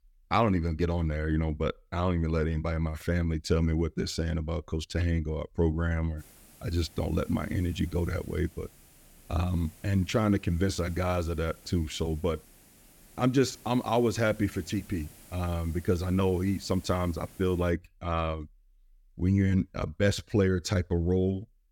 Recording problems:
hiss; faint; from 6 to 18 s; 25 dB below the speech

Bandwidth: 17.5 kHz